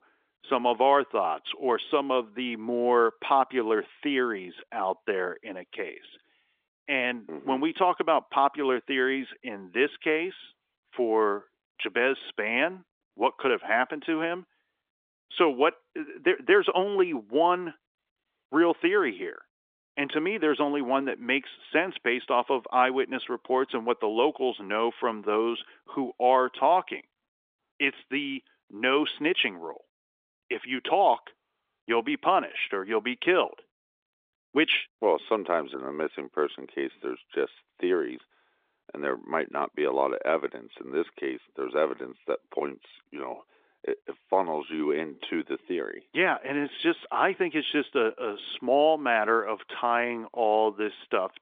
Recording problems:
phone-call audio; nothing above 3.5 kHz

